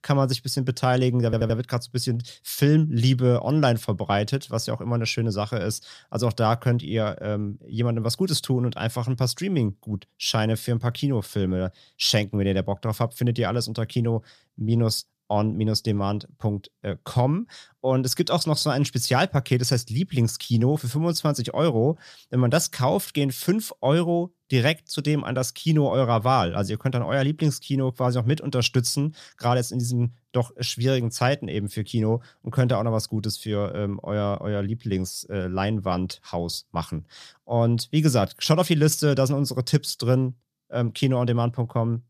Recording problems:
audio stuttering; at 1.5 s

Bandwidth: 14.5 kHz